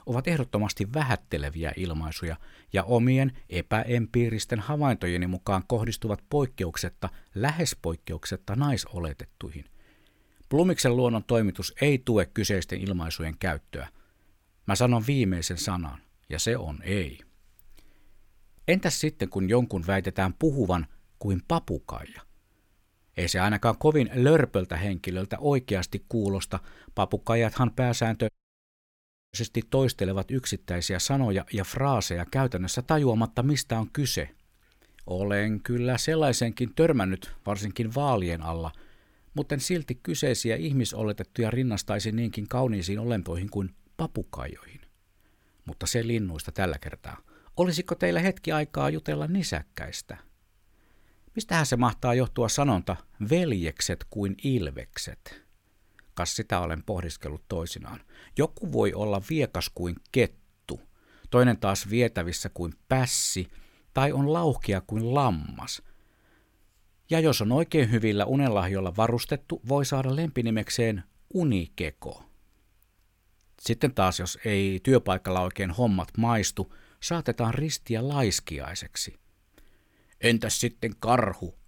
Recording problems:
audio cutting out; at 28 s for 1 s

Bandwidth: 16.5 kHz